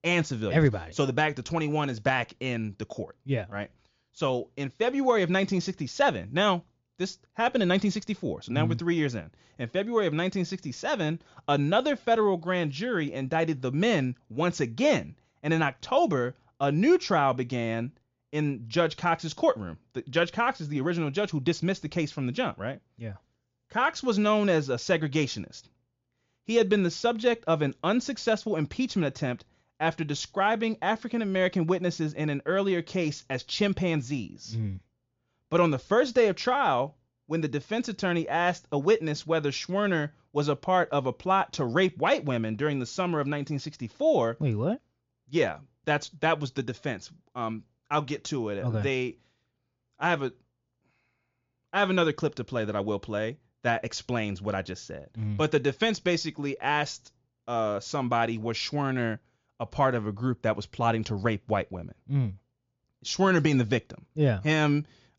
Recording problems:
high frequencies cut off; noticeable; nothing above 7 kHz

